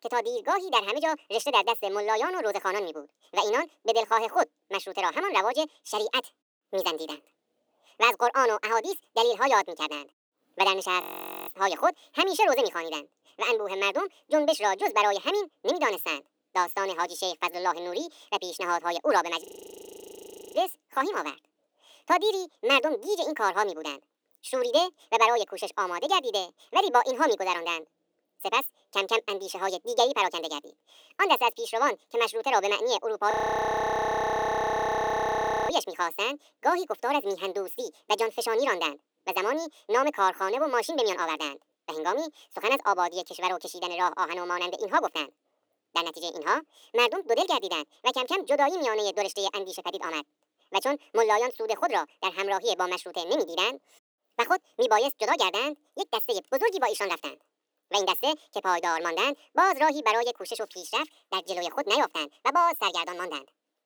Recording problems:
wrong speed and pitch; too fast and too high; 1.7 times normal speed
thin; somewhat; fading below 300 Hz
audio freezing; at 11 s, at 19 s for 1 s and at 33 s for 2.5 s

